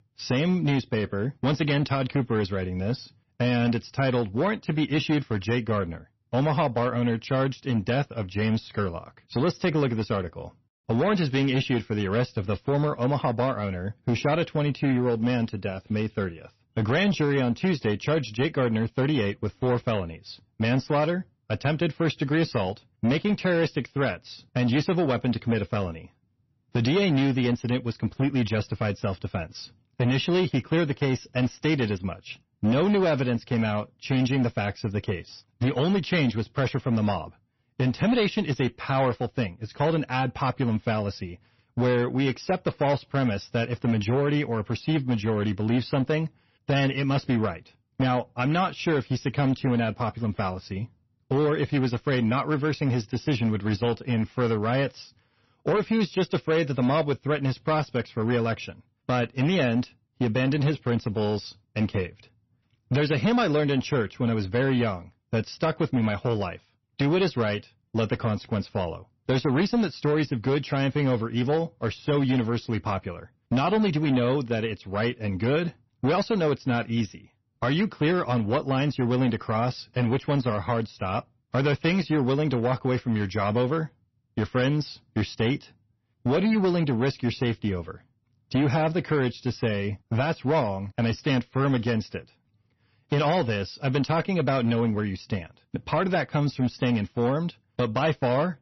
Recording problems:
distortion; slight; 9% of the sound clipped
garbled, watery; slightly; nothing above 6 kHz

